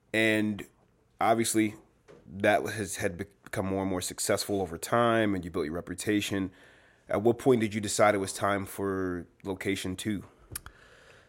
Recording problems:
none

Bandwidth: 16 kHz